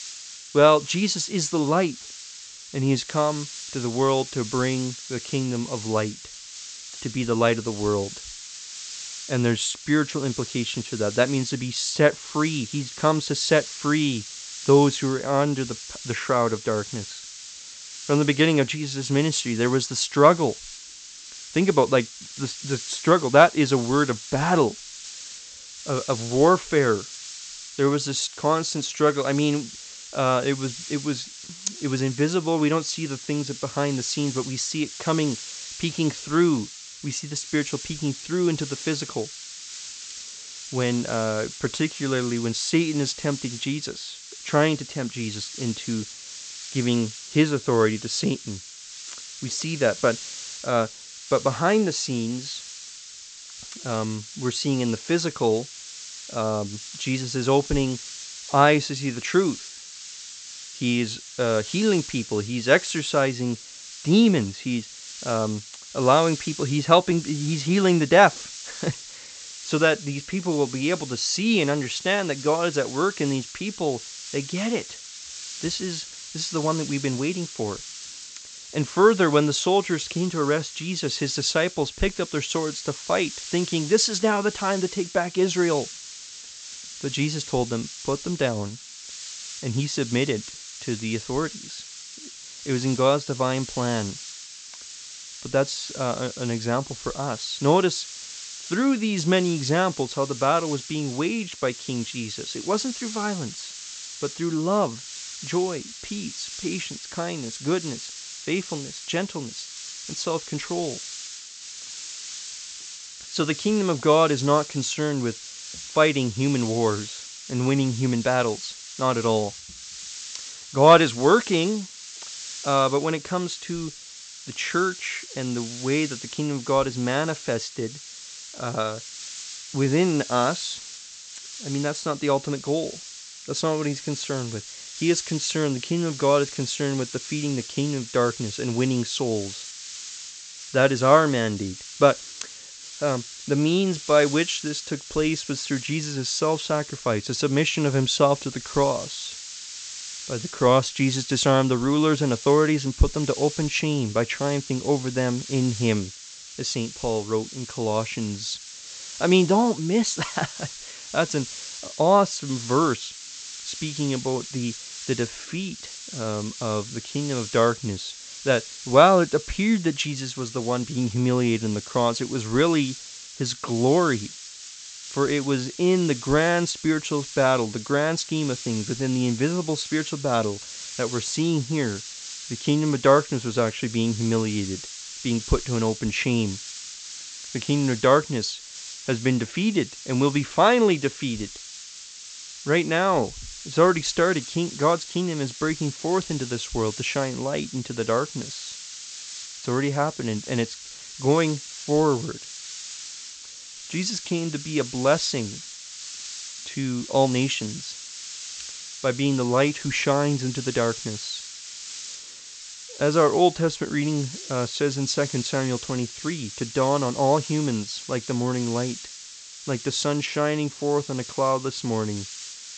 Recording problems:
high frequencies cut off; noticeable; nothing above 8 kHz
hiss; noticeable; throughout; 10 dB below the speech

